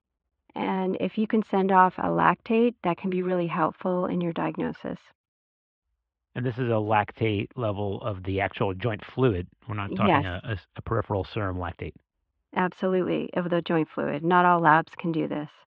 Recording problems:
muffled; very; fading above 3.5 kHz

